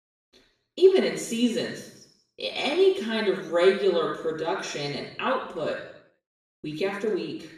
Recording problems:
off-mic speech; far
room echo; noticeable; dies away in 0.7 s

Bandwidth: 14.5 kHz